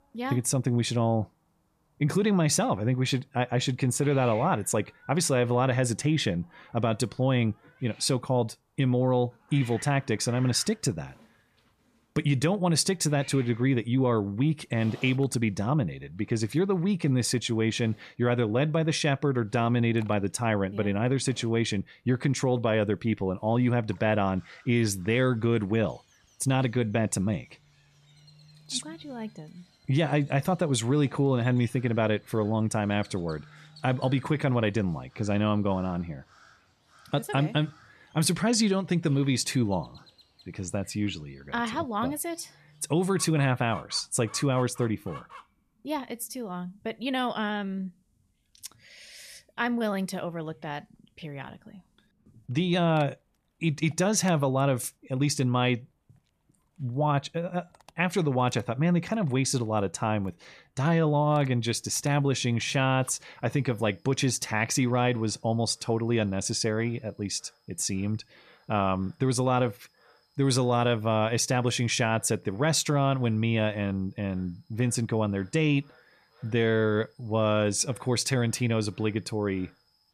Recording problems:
animal sounds; faint; throughout; 25 dB below the speech

